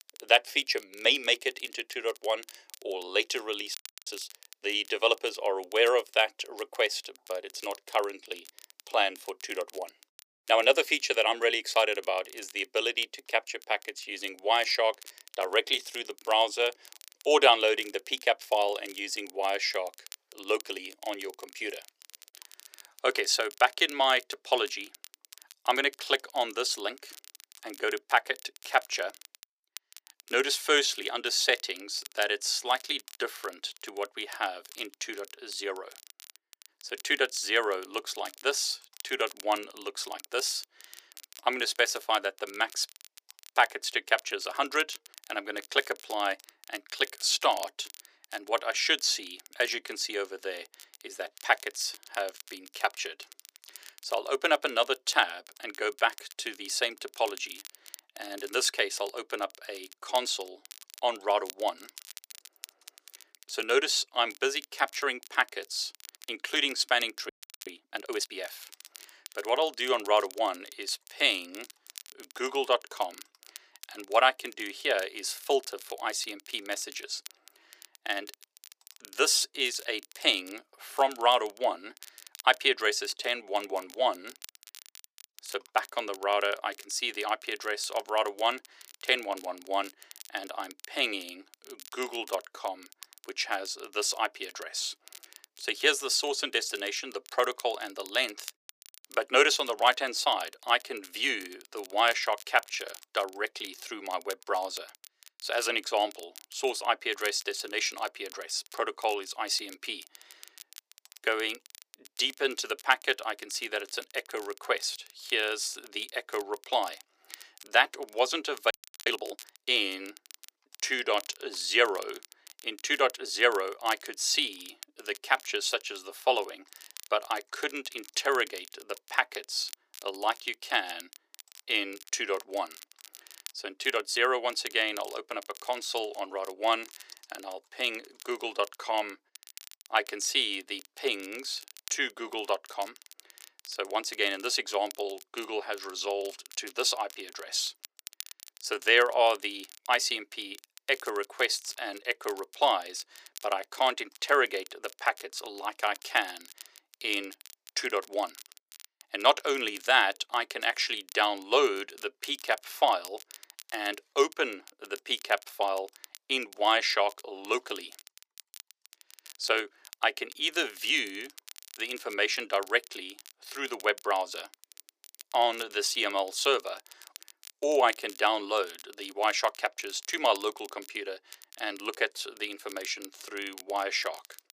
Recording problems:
thin; very; fading below 400 Hz
crackle, like an old record; faint; 20 dB below the speech
audio freezing; at 4 s, at 1:07 and at 1:59

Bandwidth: 15 kHz